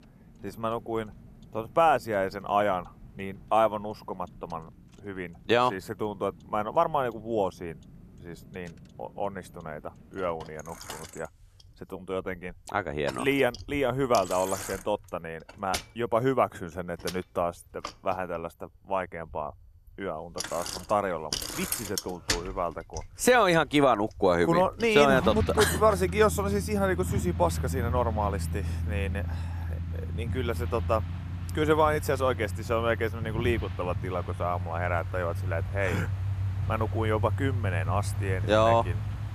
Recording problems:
traffic noise; loud; throughout; 6 dB below the speech

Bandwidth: 14 kHz